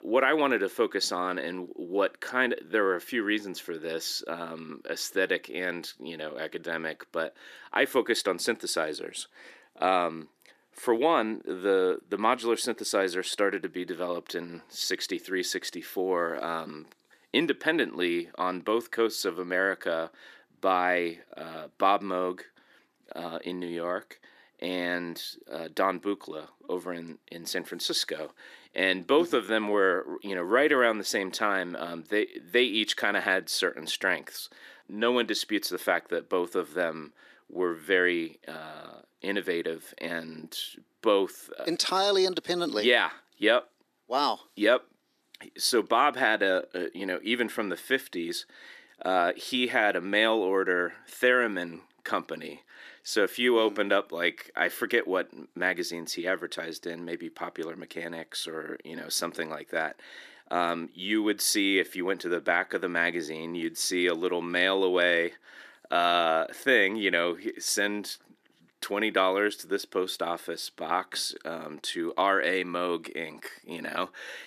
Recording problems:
thin; somewhat; fading below 300 Hz

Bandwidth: 14.5 kHz